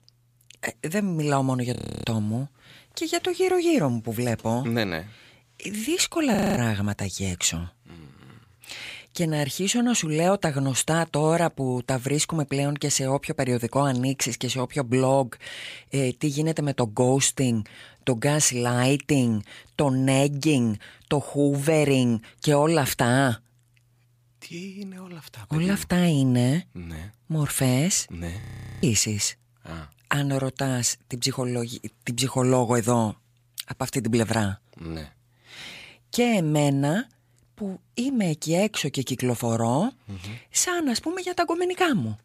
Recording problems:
audio freezing; at 2 s, at 6.5 s and at 28 s

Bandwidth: 15 kHz